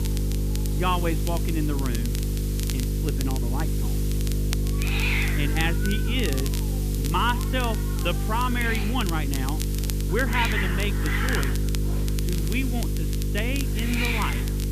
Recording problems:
high frequencies cut off; severe; nothing above 4 kHz
electrical hum; loud; throughout; 50 Hz, 9 dB below the speech
hiss; loud; throughout; 4 dB below the speech
crackle, like an old record; loud; 10 dB below the speech

